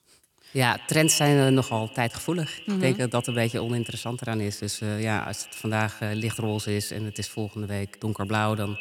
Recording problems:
echo of what is said; noticeable; throughout; 140 ms later, 10 dB below the speech

